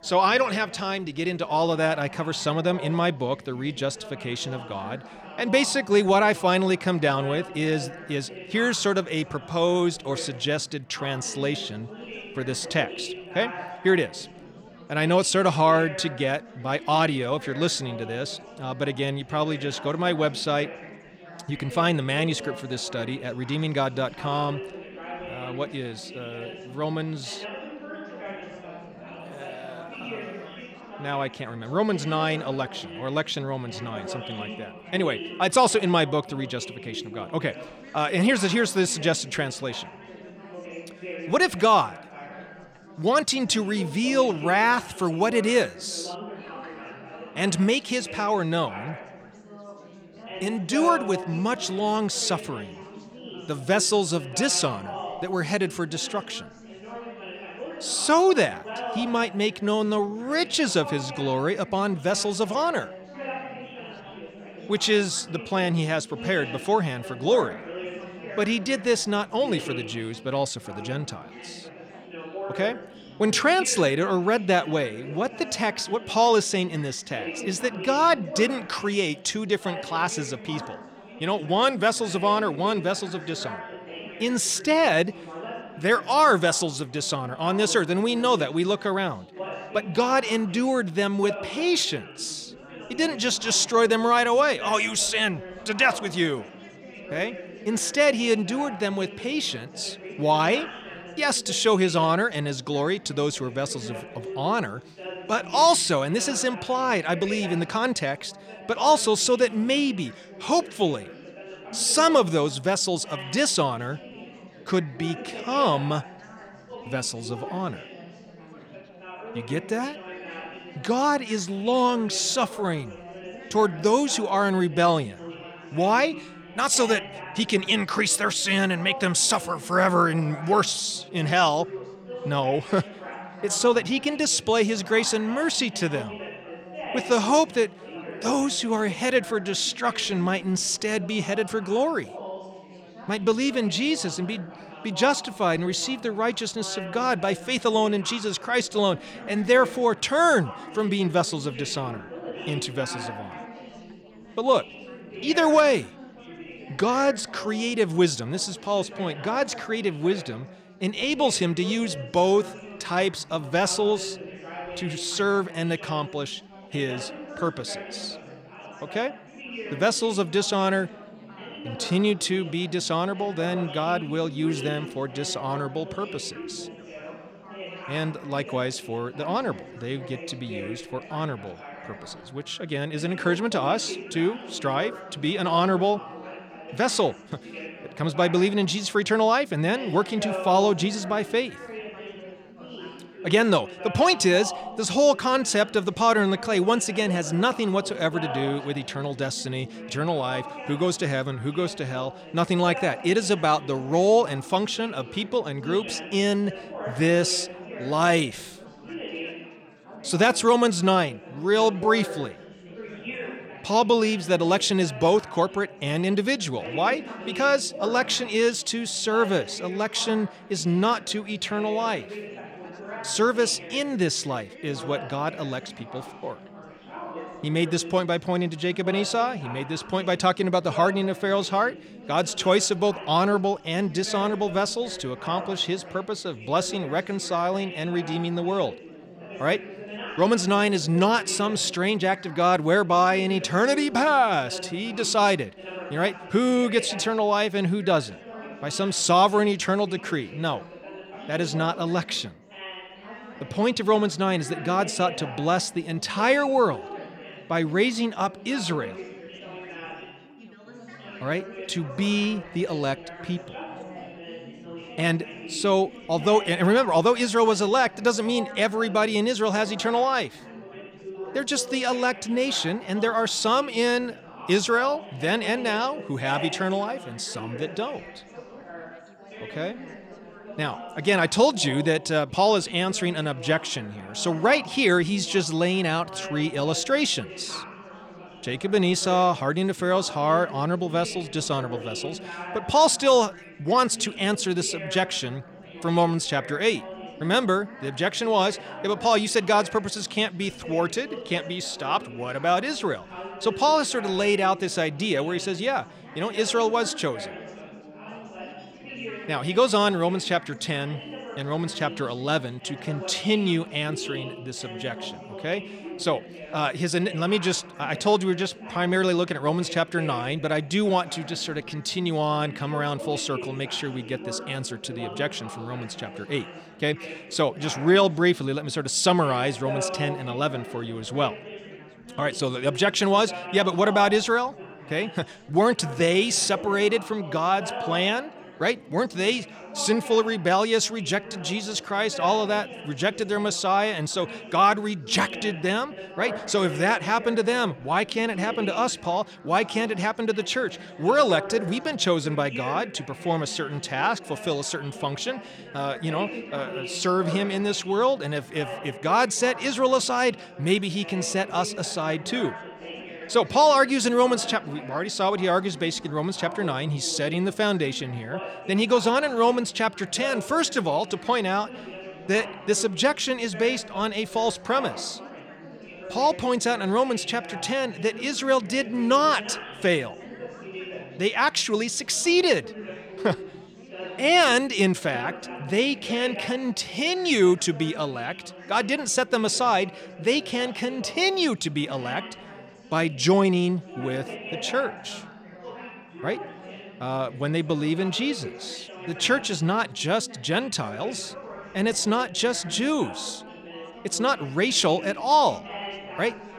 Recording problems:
chatter from many people; noticeable; throughout; 15 dB below the speech

